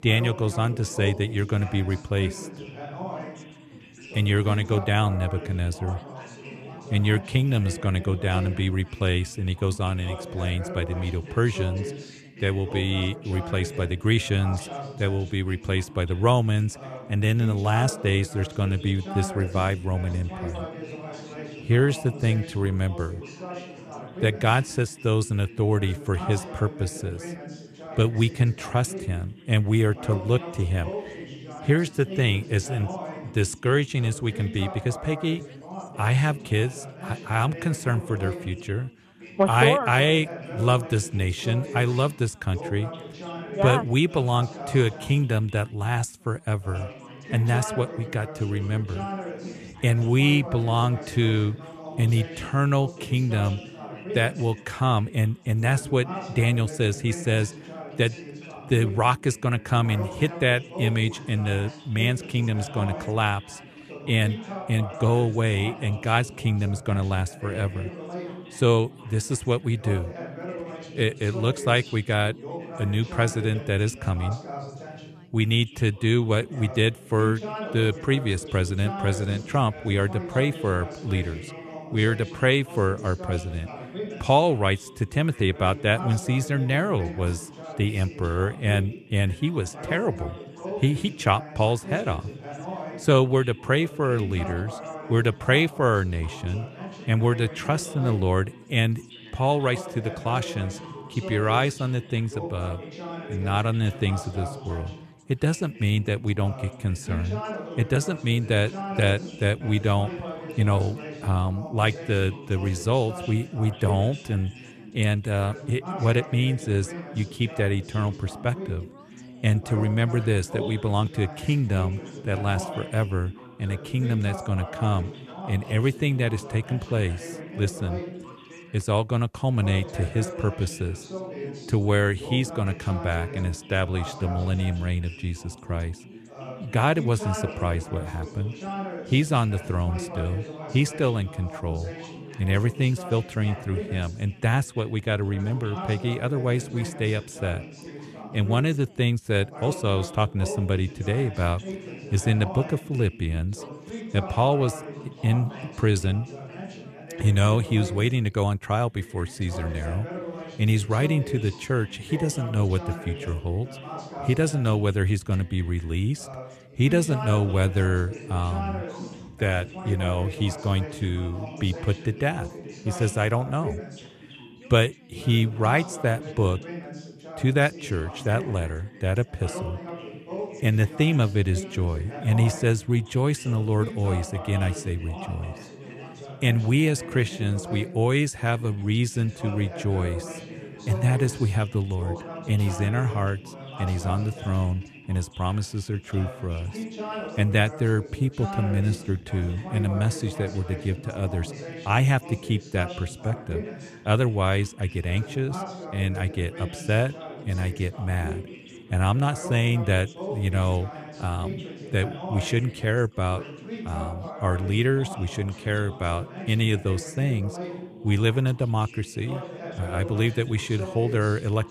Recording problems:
background chatter; noticeable; throughout; 3 voices, 10 dB below the speech

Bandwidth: 13.5 kHz